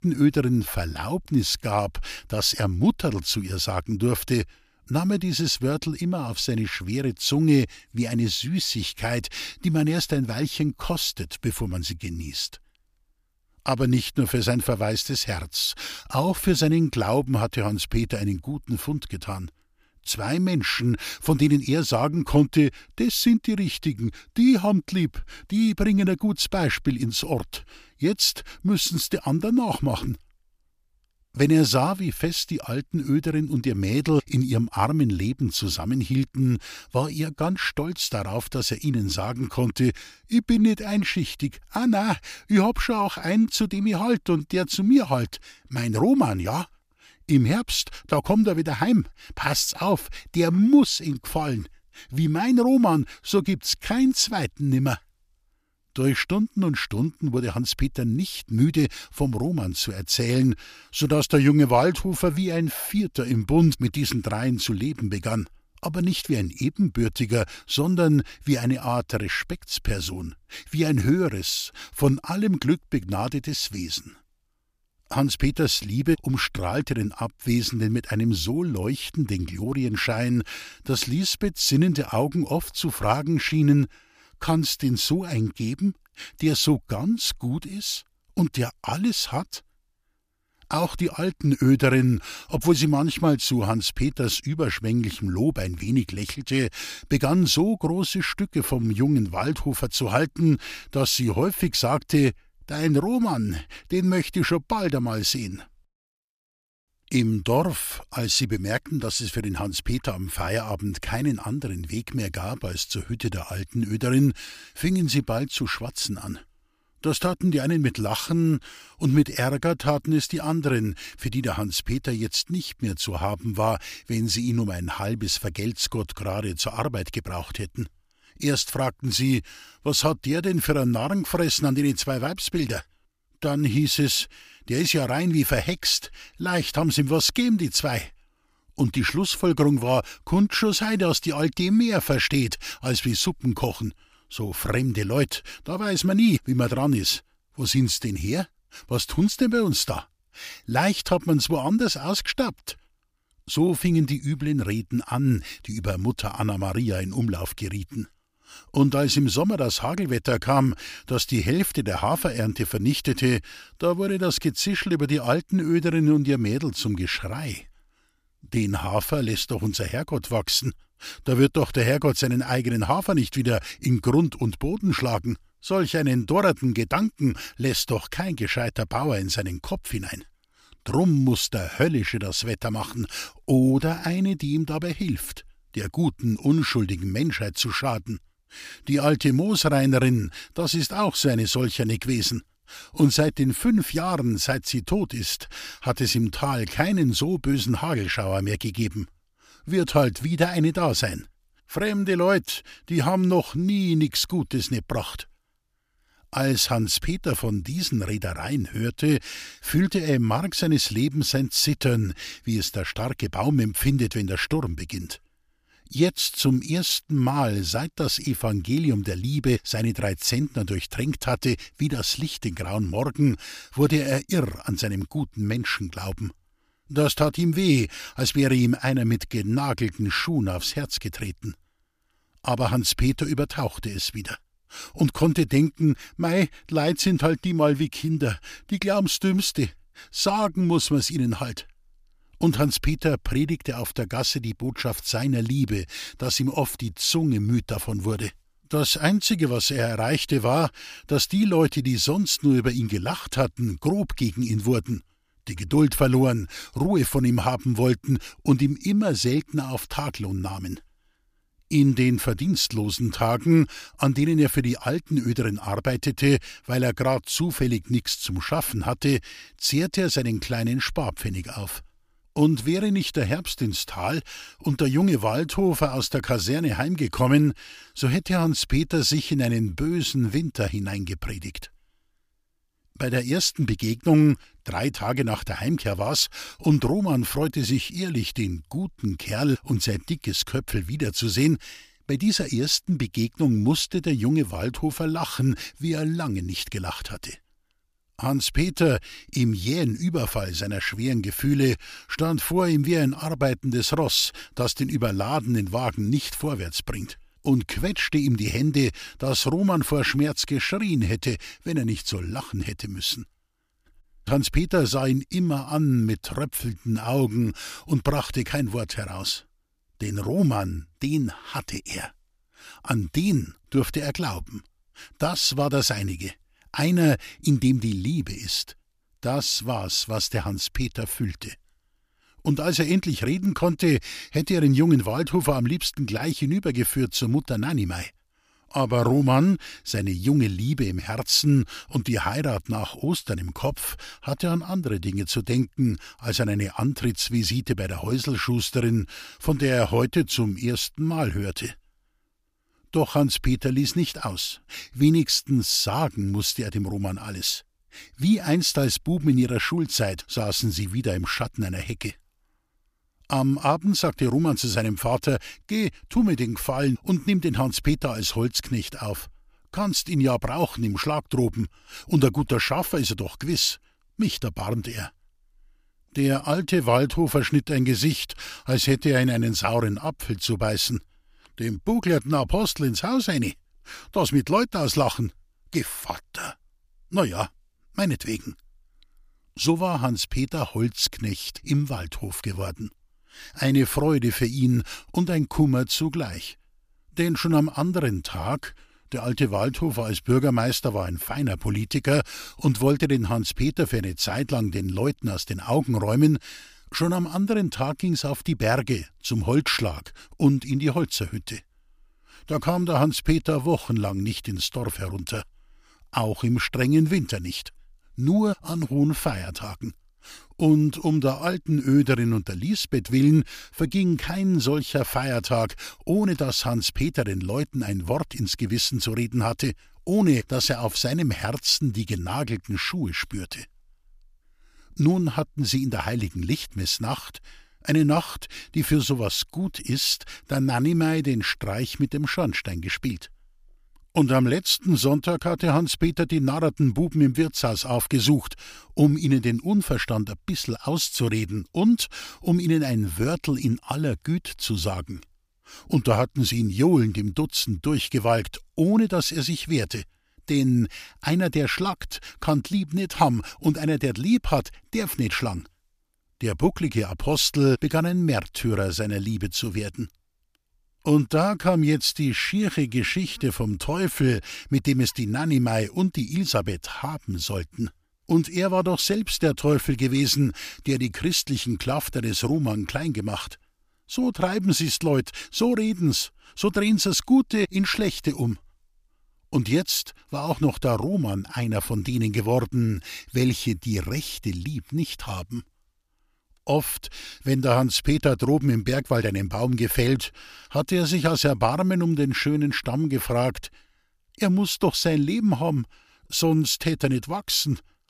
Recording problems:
none

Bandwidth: 15 kHz